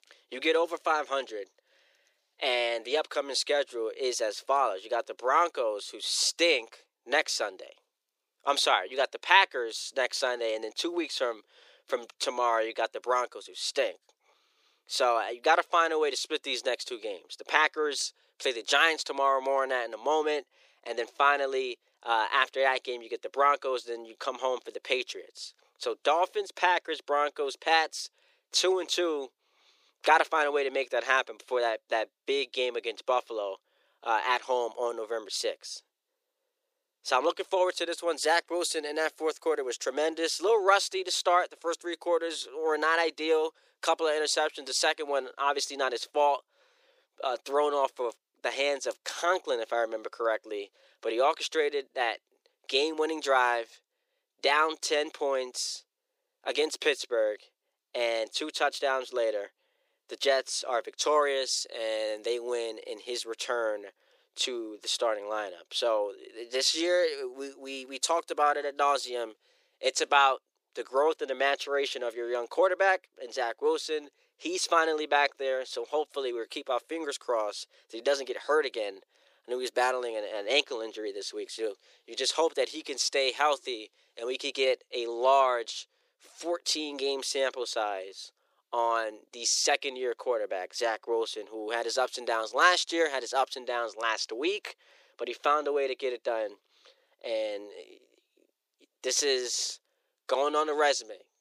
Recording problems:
thin; very; fading below 350 Hz

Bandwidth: 15 kHz